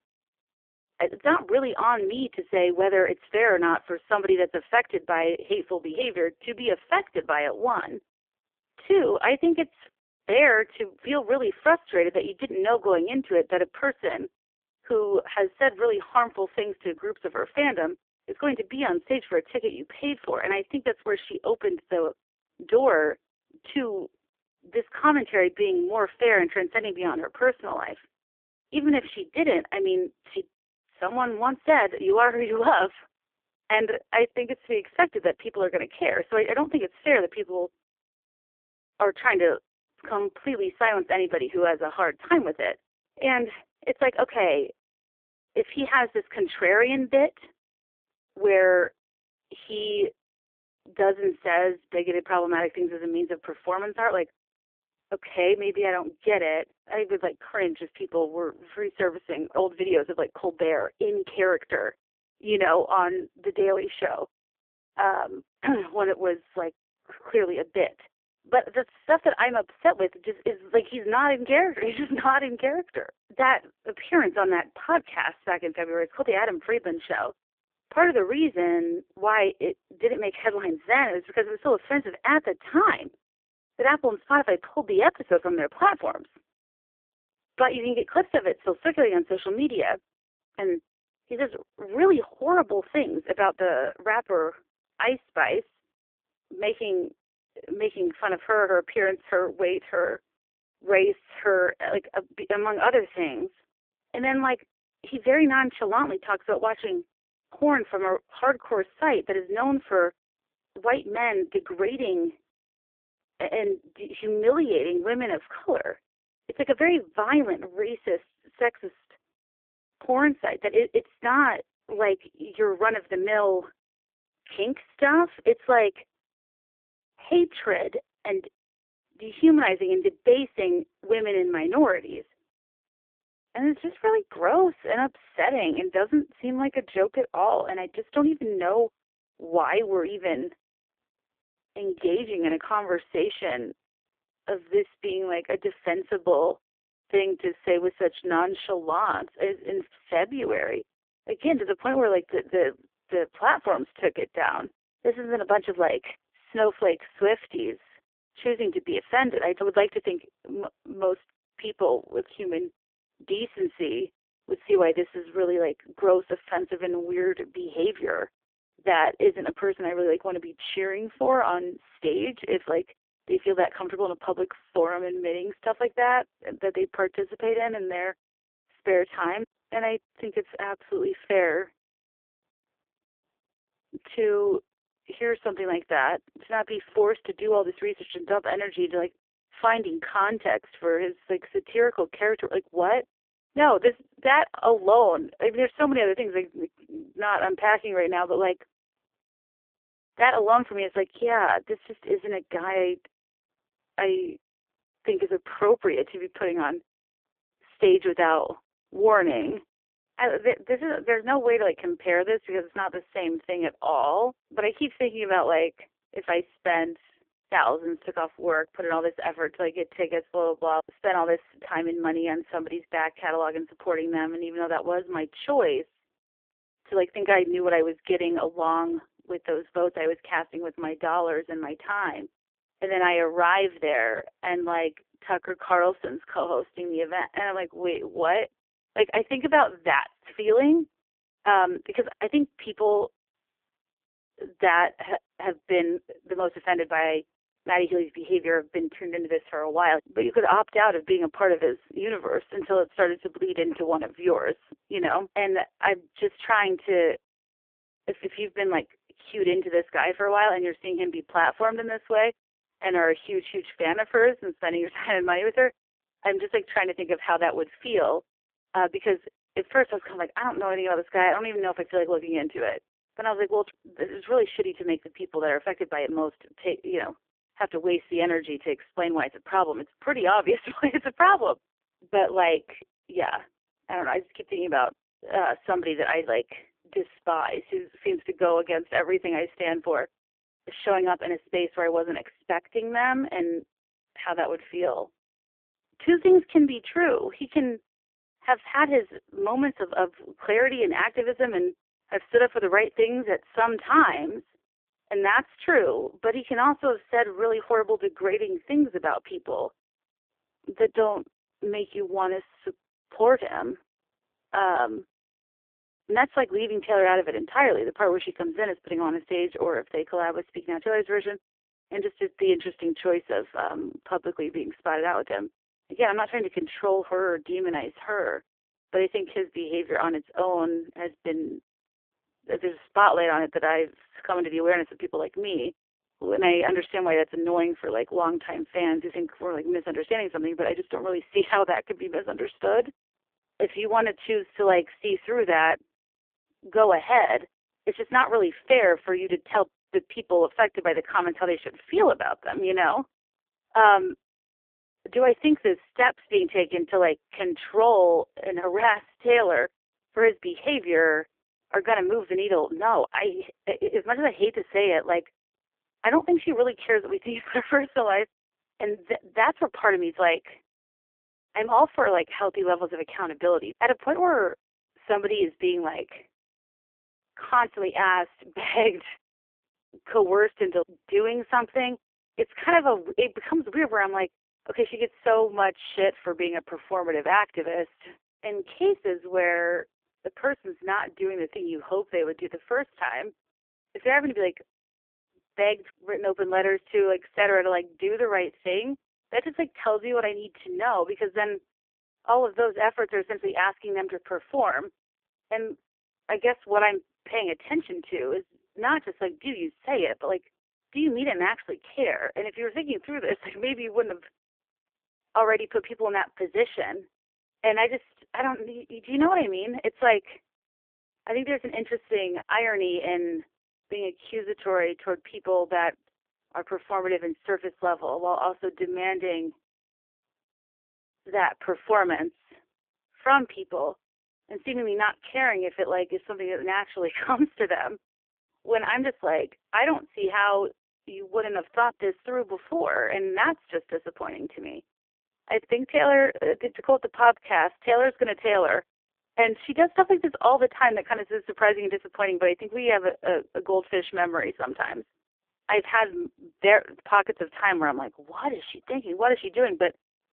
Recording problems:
phone-call audio; poor line; nothing above 3.5 kHz

